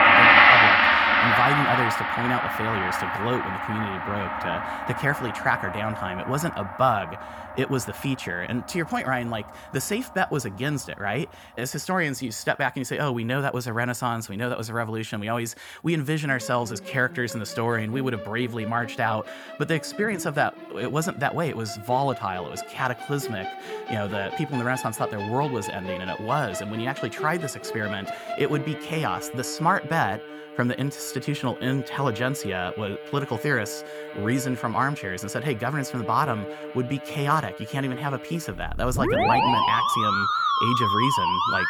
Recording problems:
background music; very loud; throughout; 4 dB above the speech

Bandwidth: 18 kHz